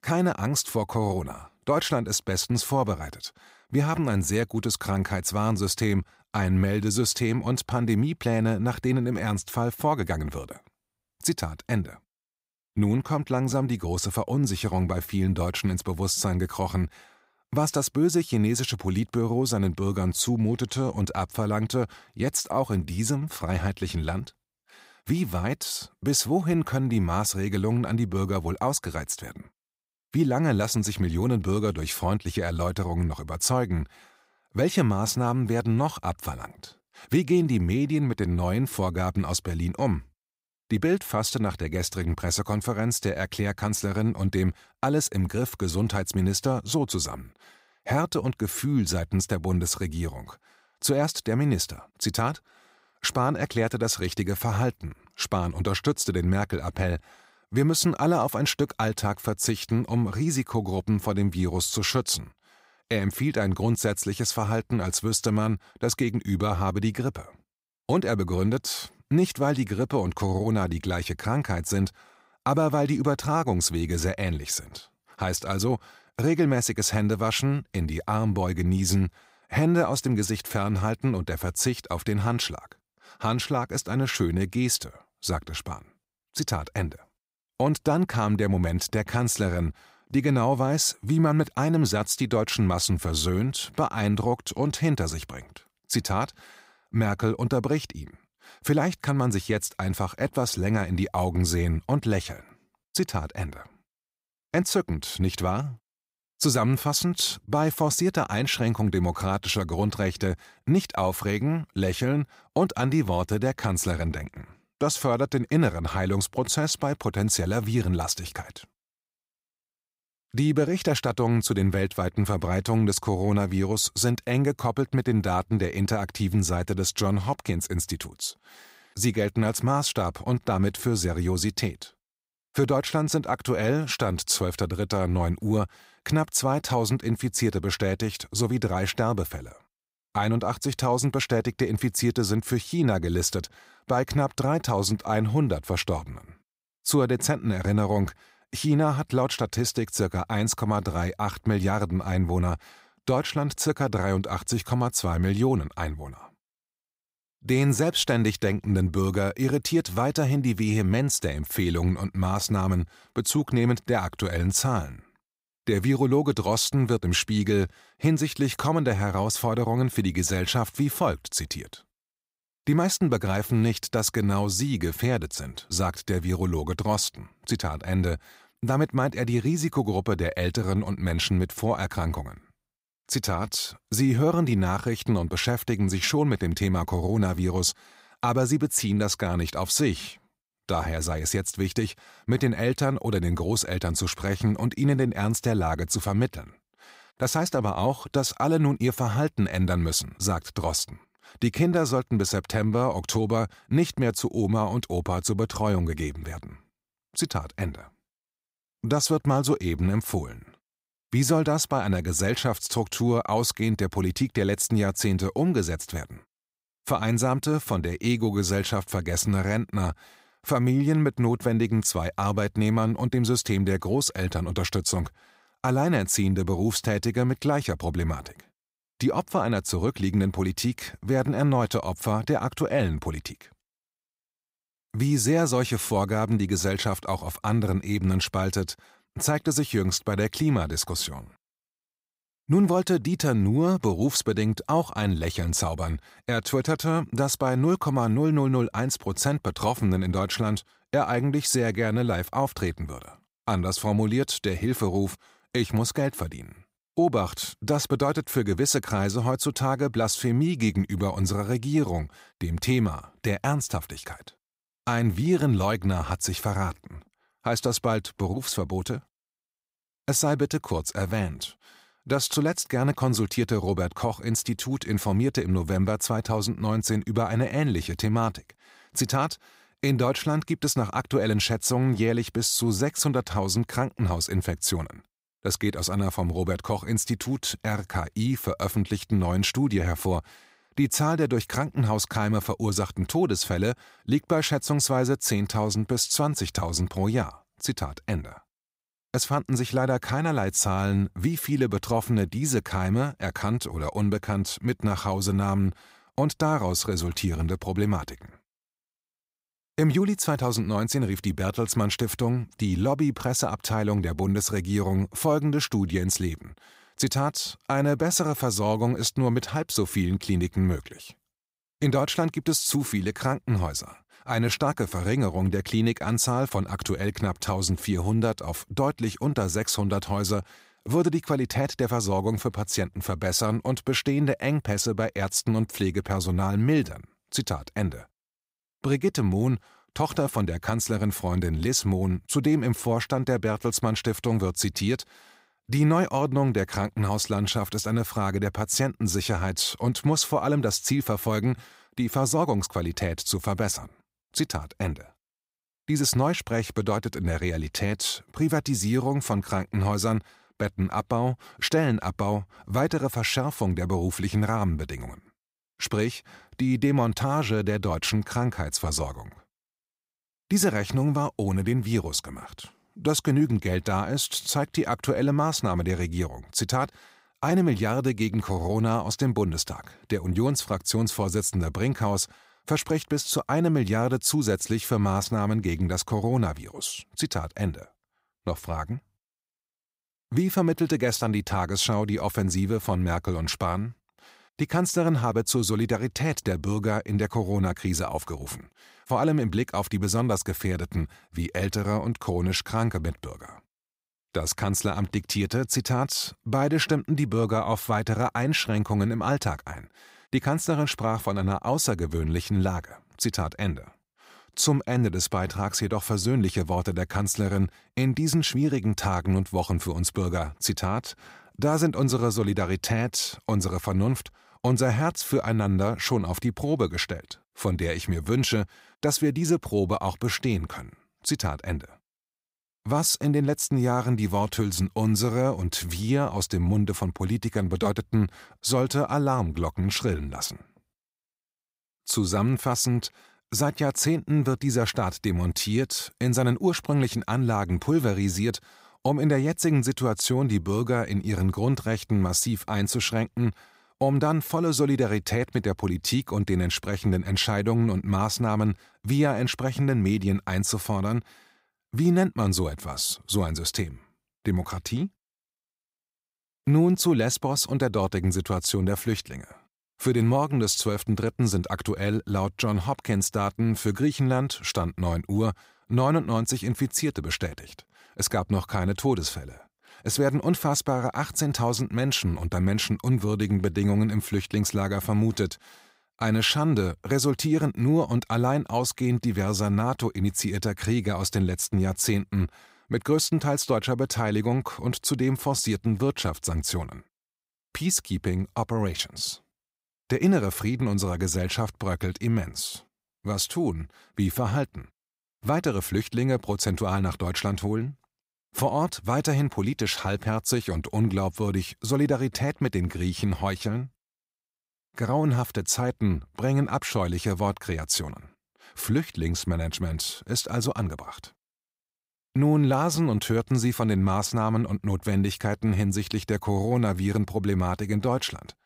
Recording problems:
none

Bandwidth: 15.5 kHz